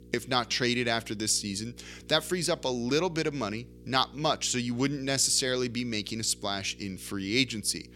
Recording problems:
electrical hum; faint; throughout; 60 Hz, 30 dB below the speech

